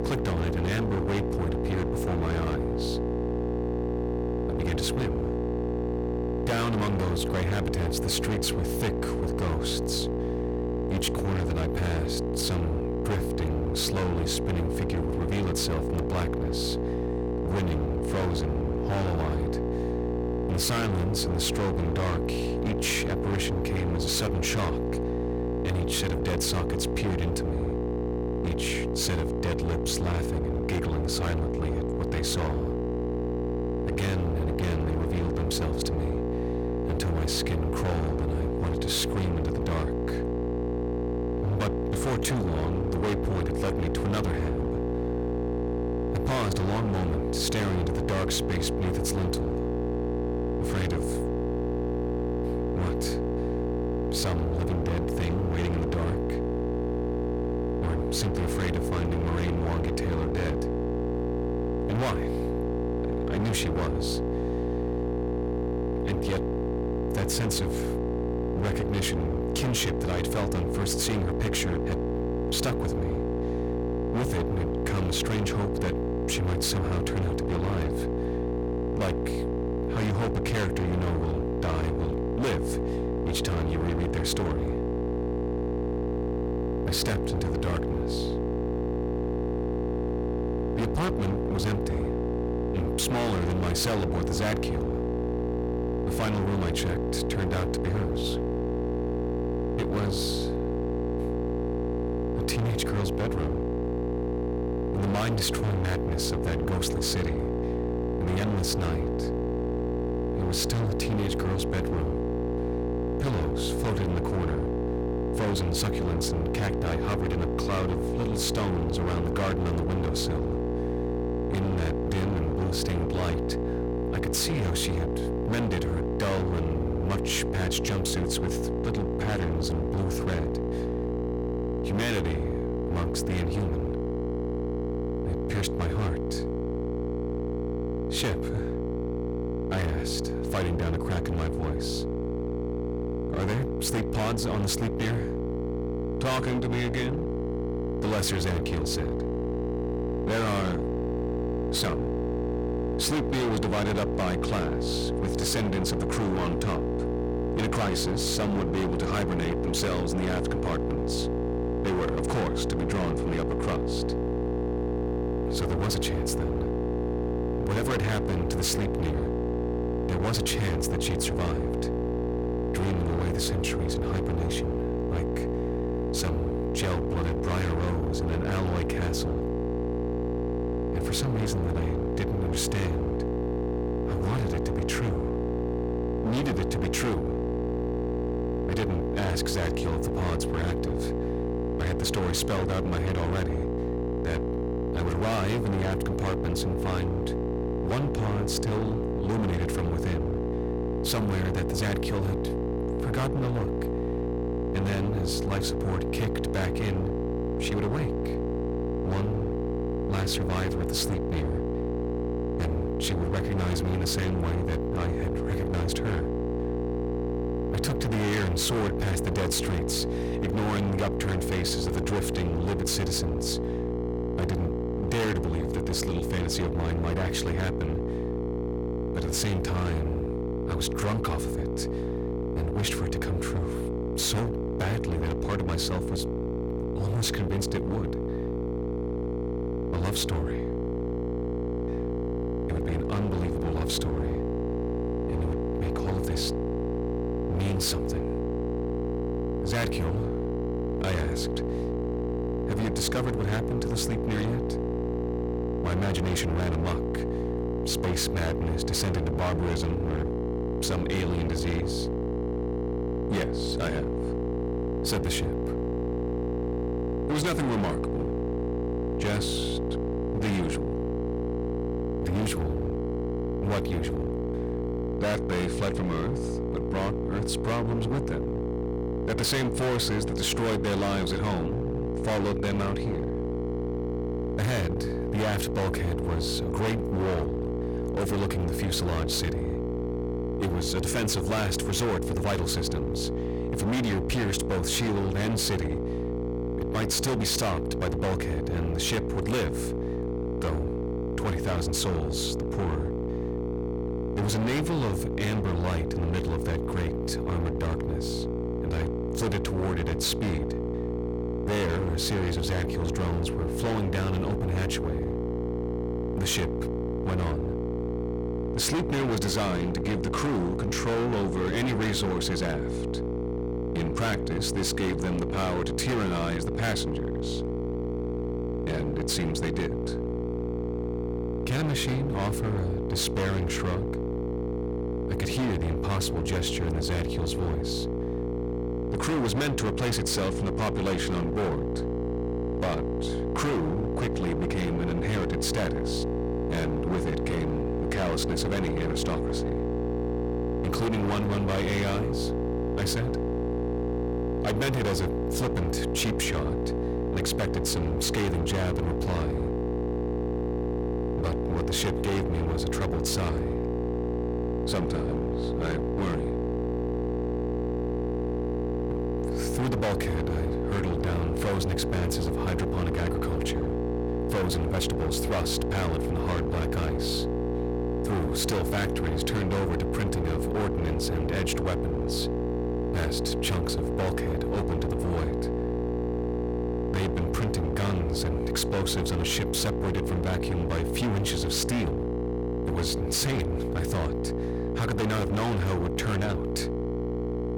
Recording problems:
distortion; heavy; 27% of the sound clipped
electrical hum; loud; throughout; 60 Hz, 1 dB below the speech

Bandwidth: 18.5 kHz